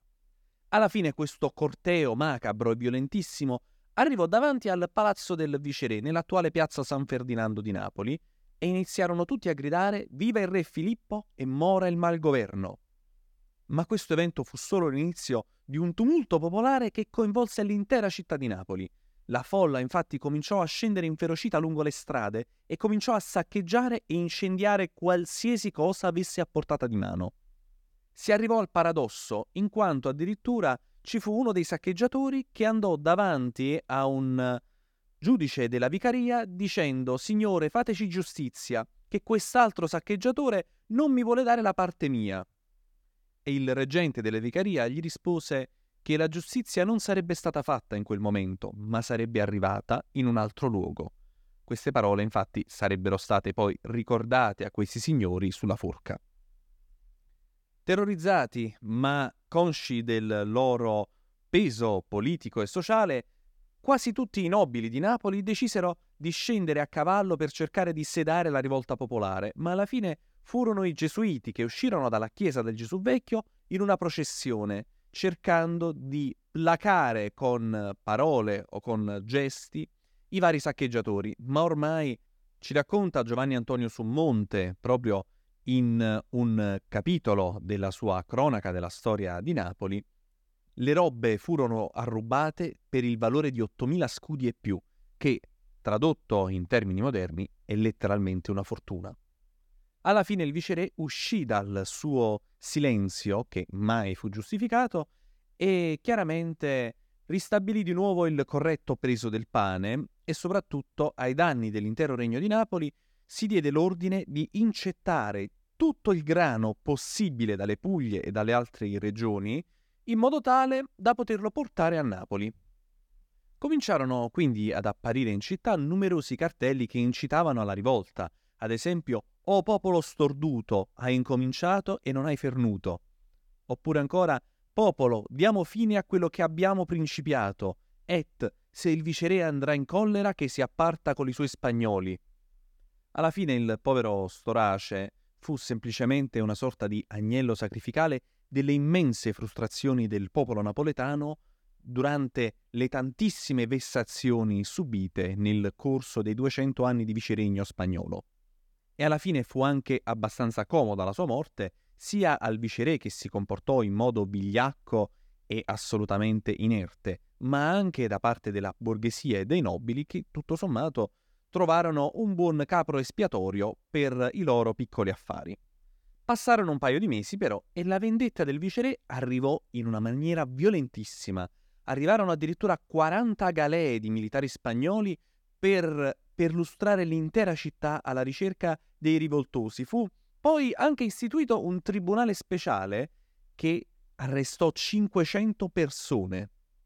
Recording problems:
none

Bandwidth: 18.5 kHz